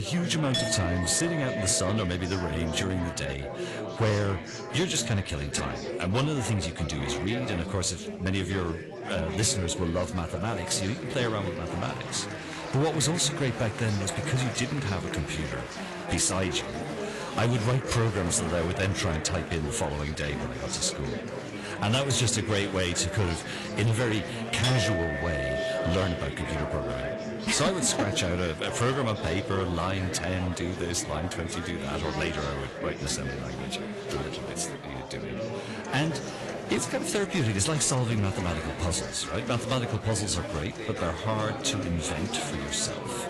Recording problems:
distortion; slight; 6% of the sound clipped
garbled, watery; slightly; nothing above 11 kHz
household noises; loud; throughout; 7 dB below the speech
chatter from many people; loud; throughout; 7 dB below the speech
abrupt cut into speech; at the start

